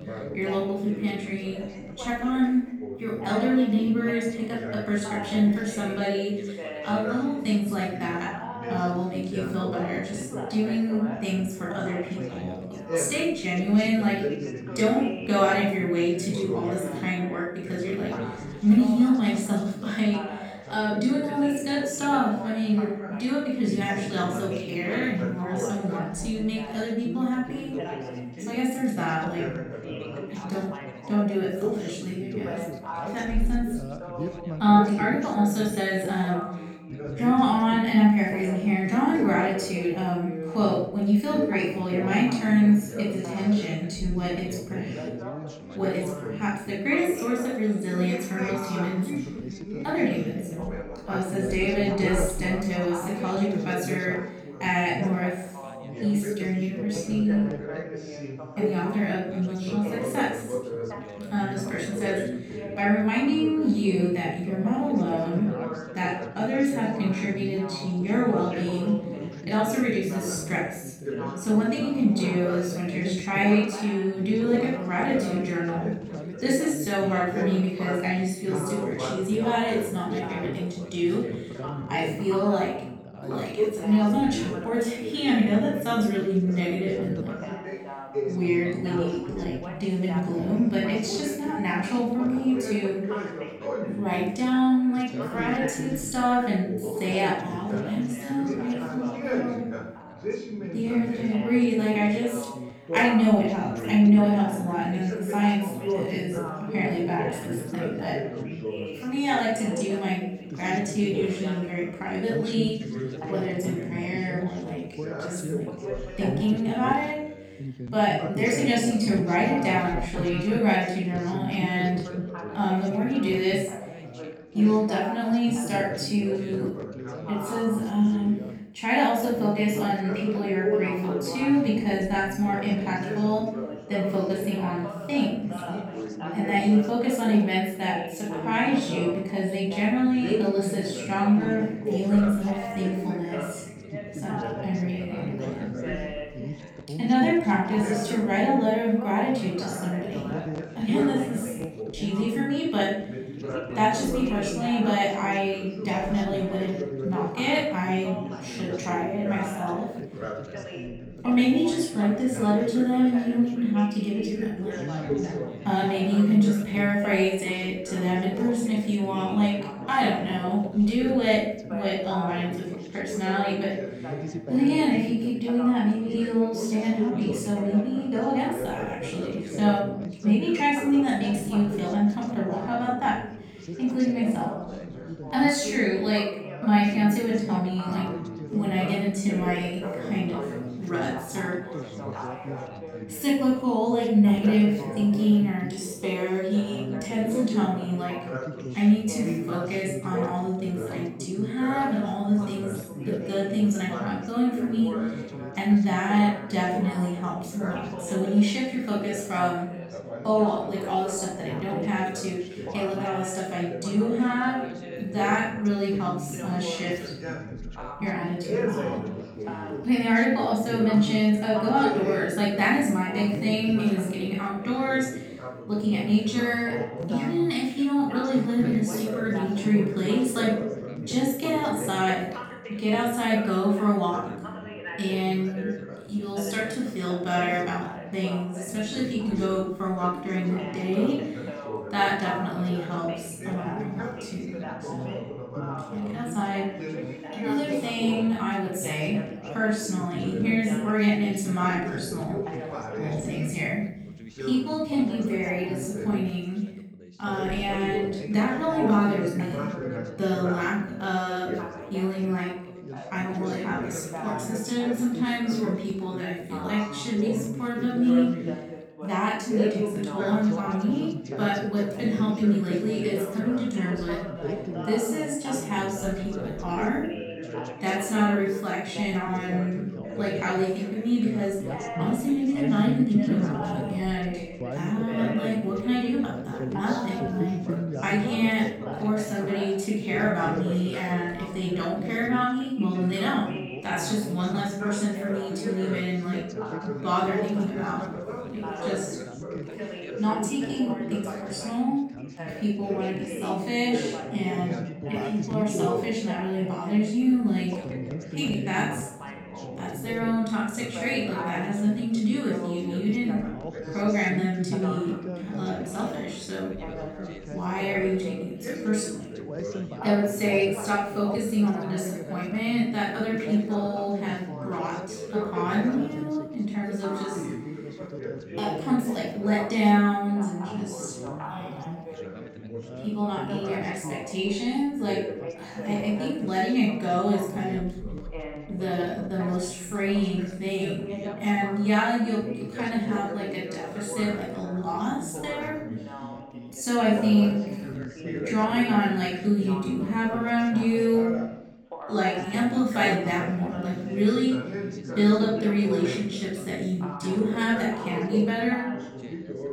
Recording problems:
off-mic speech; far
room echo; noticeable; dies away in 0.6 s
background chatter; loud; throughout; 4 voices, 9 dB below the speech

